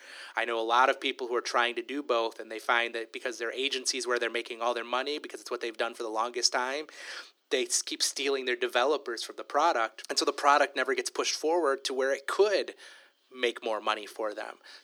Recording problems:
thin; somewhat; fading below 350 Hz

